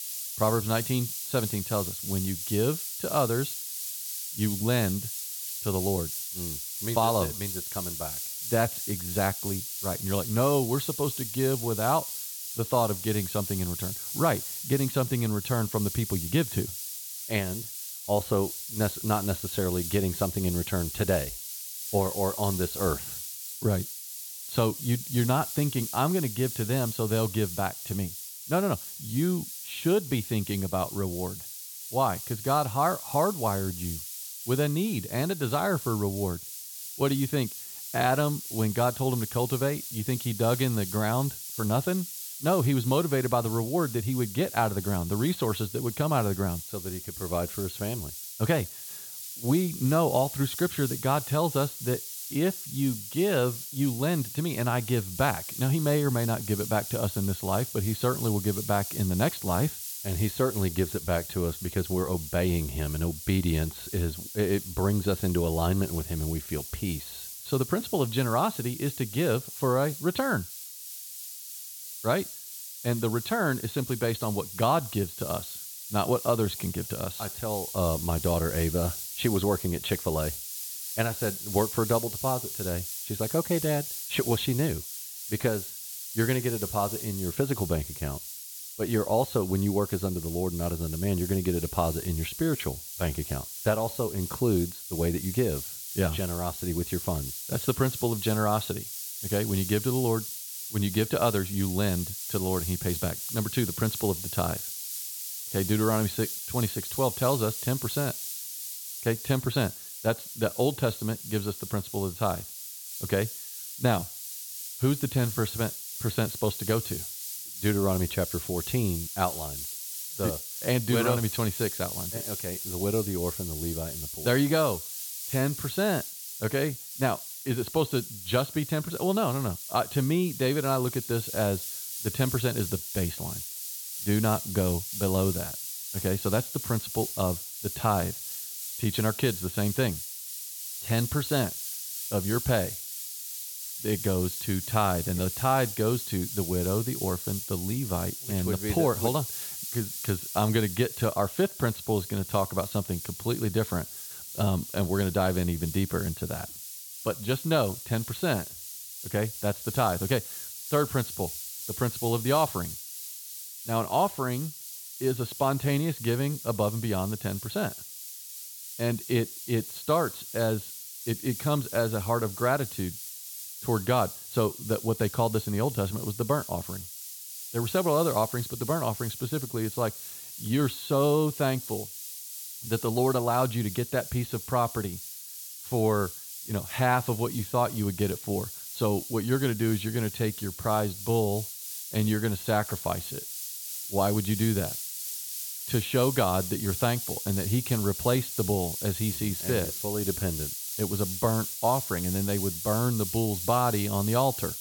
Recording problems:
high frequencies cut off; severe; nothing above 4.5 kHz
hiss; loud; throughout; 6 dB below the speech

